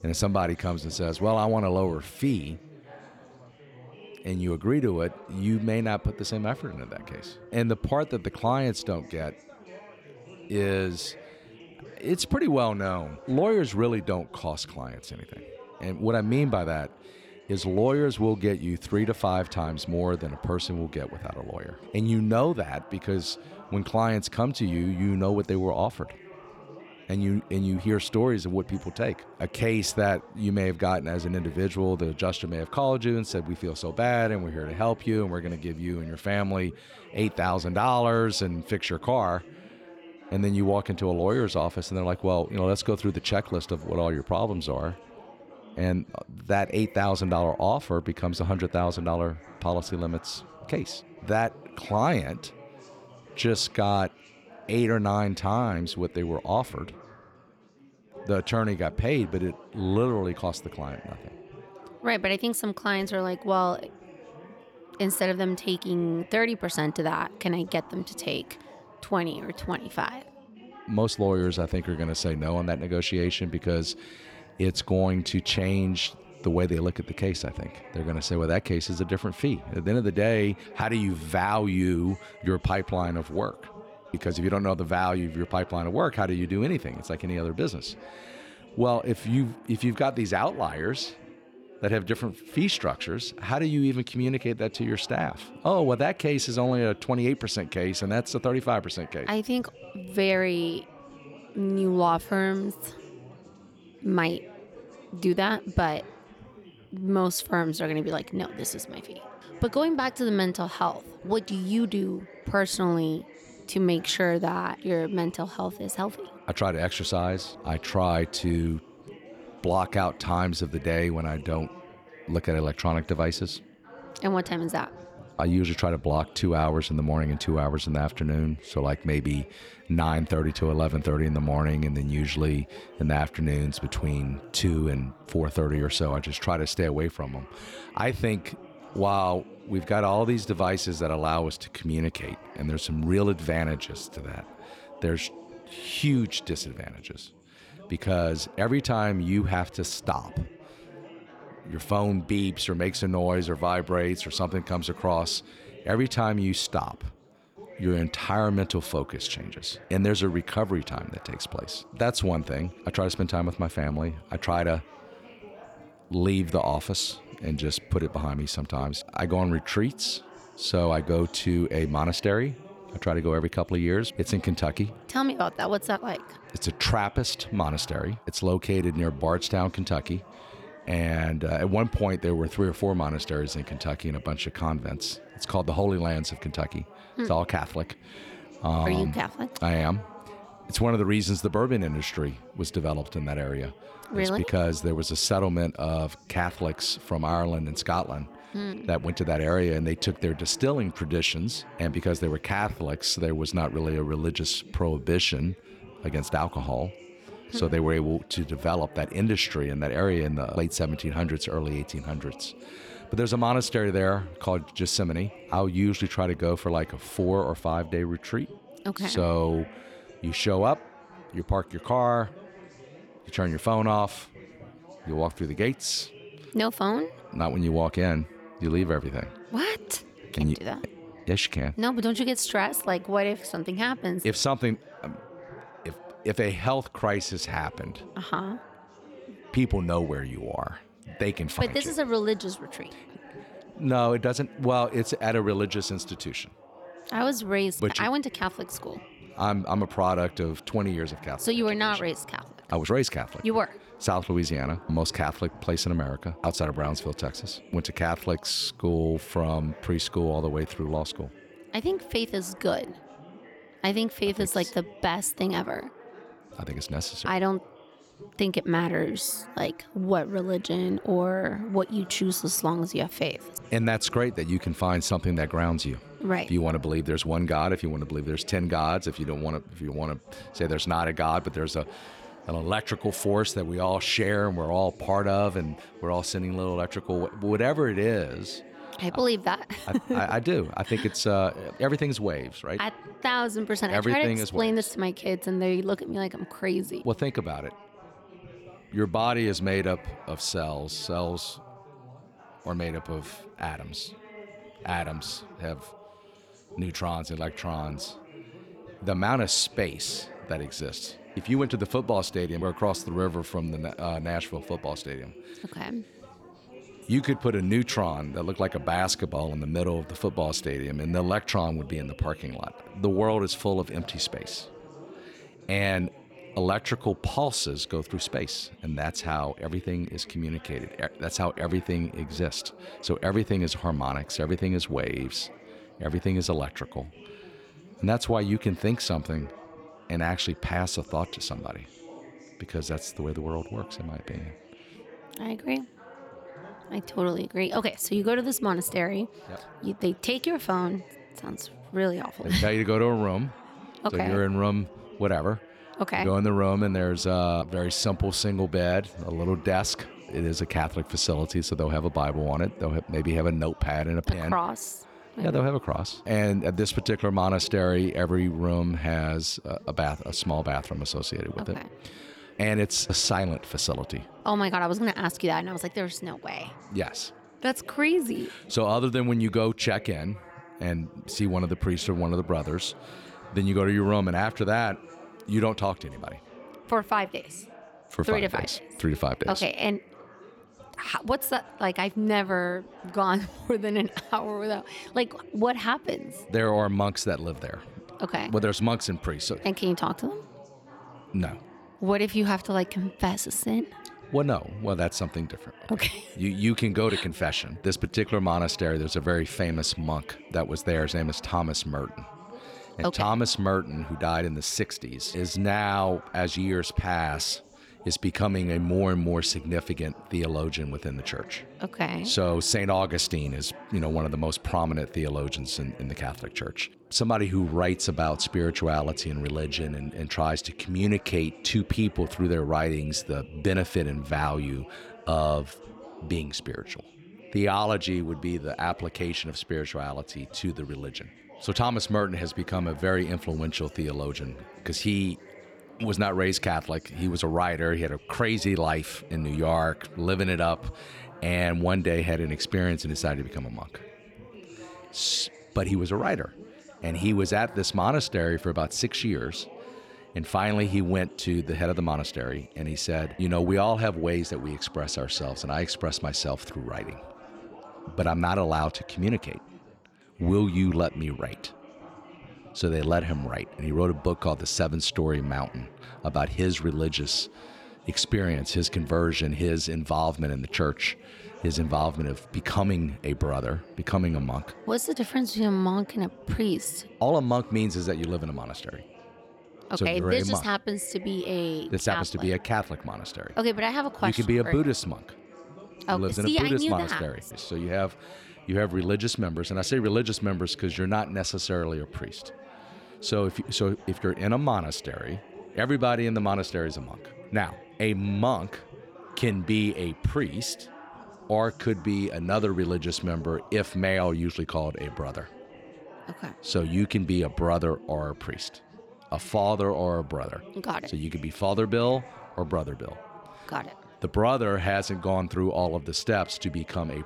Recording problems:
chatter from many people; faint; throughout; 20 dB below the speech

